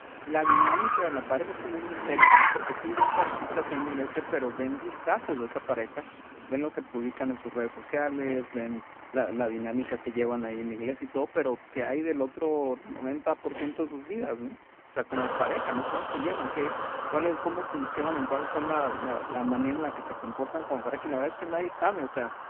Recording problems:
phone-call audio; poor line
traffic noise; very loud; throughout; 2 dB above the speech

